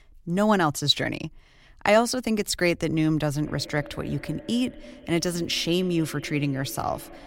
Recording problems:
echo of what is said; faint; from 3.5 s on; 210 ms later, 20 dB below the speech

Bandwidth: 16 kHz